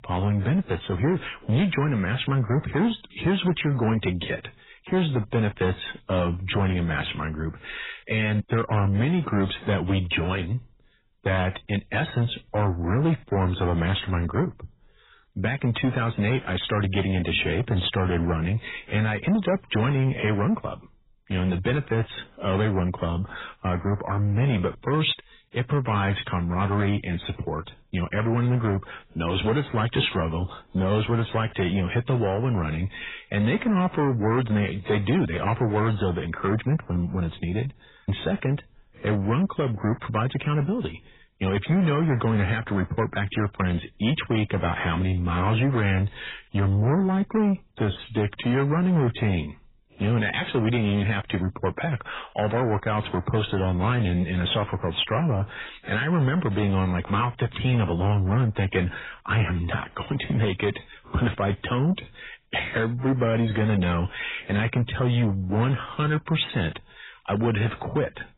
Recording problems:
garbled, watery; badly; nothing above 4 kHz
distortion; slight; 10 dB below the speech

